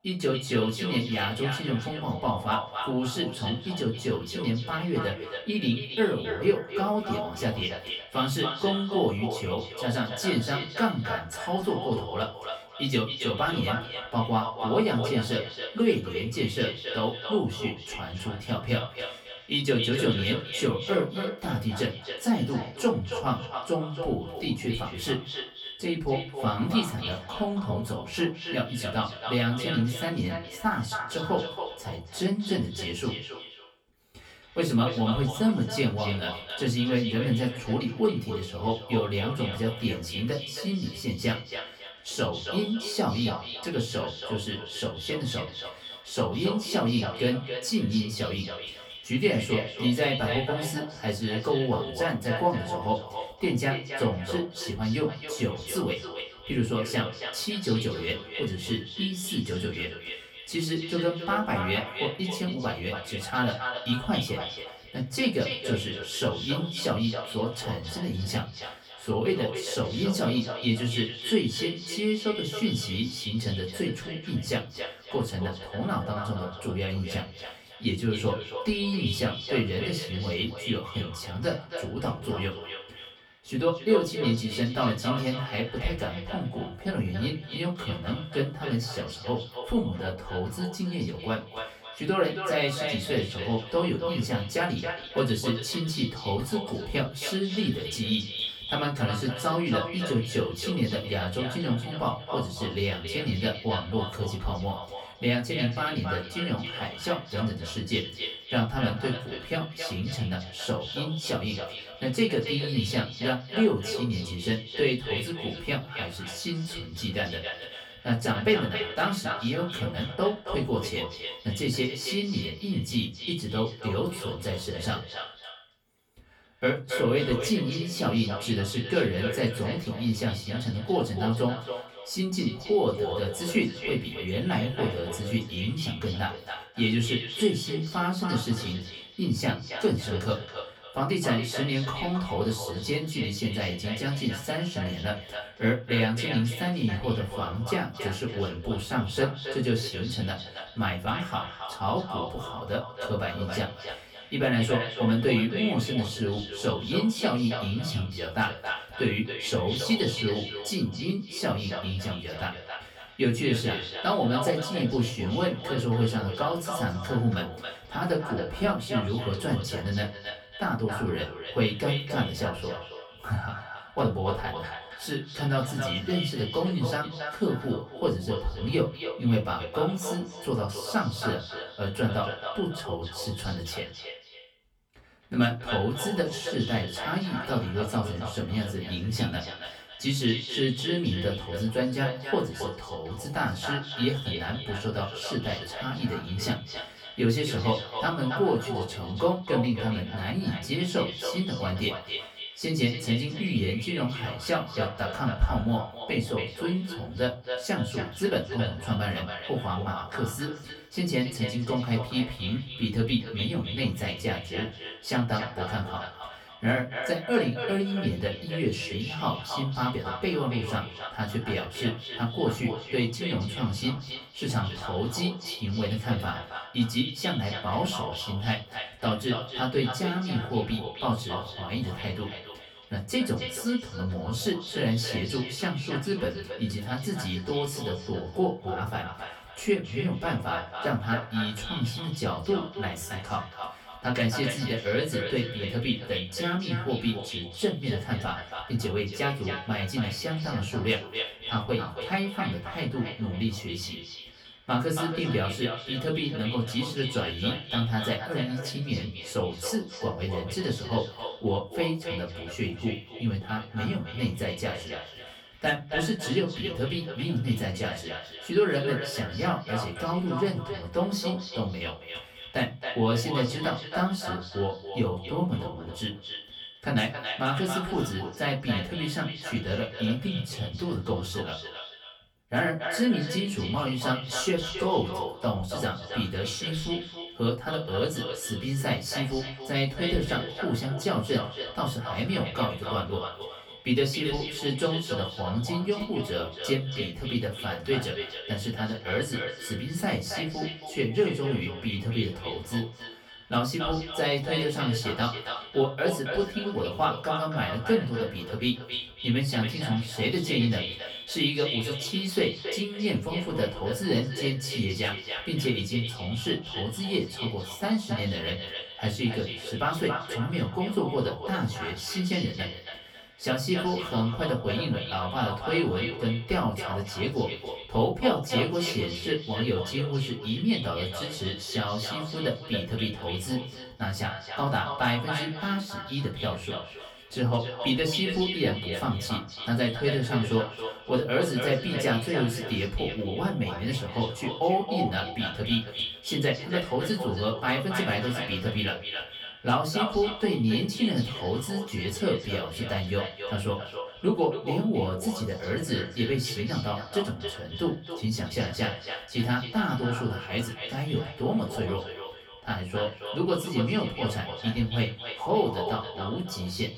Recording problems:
echo of what is said; strong; throughout; 270 ms later, 7 dB below the speech
off-mic speech; far
room echo; very slight; dies away in 0.3 s

